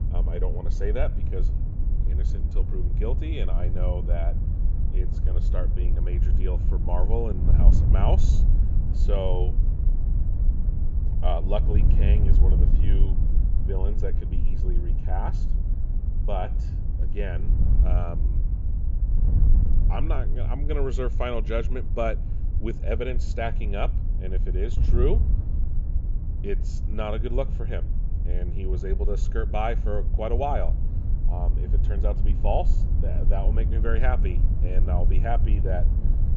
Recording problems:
high frequencies cut off; noticeable; nothing above 7.5 kHz
wind noise on the microphone; heavy; 10 dB below the speech

